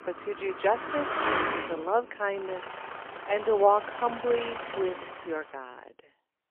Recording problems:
phone-call audio; poor line; nothing above 3 kHz
traffic noise; loud; until 5 s; 5 dB below the speech

